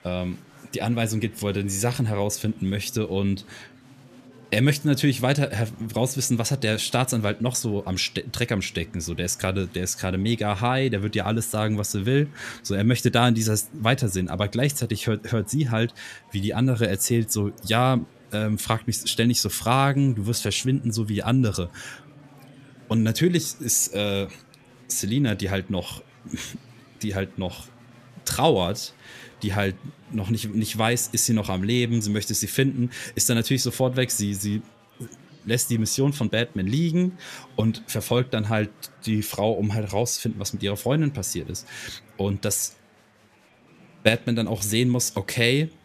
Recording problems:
murmuring crowd; faint; throughout; 25 dB below the speech

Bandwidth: 14.5 kHz